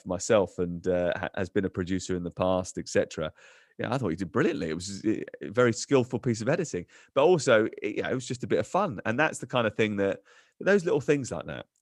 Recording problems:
none

